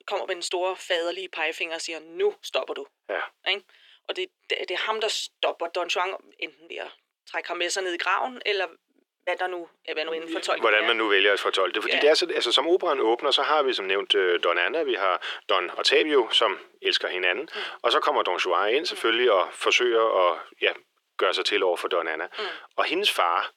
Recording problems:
thin; very; fading below 350 Hz

